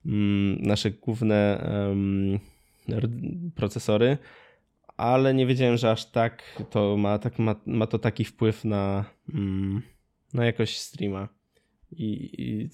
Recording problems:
none

